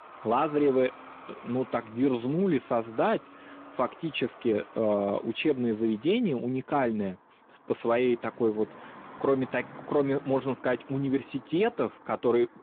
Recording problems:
phone-call audio
traffic noise; faint; throughout; 20 dB below the speech

